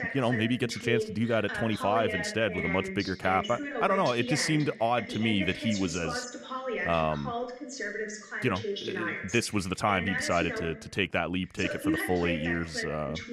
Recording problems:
voice in the background; loud; throughout; 5 dB below the speech

